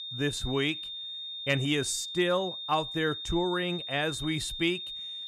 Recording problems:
high-pitched whine; loud; throughout; 3.5 kHz, 6 dB below the speech

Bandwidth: 14.5 kHz